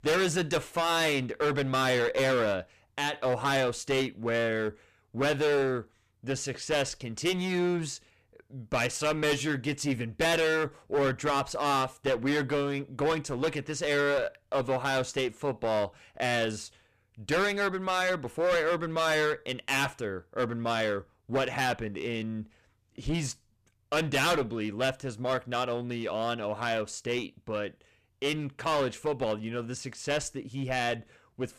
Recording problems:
distortion; heavy; 13% of the sound clipped

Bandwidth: 14.5 kHz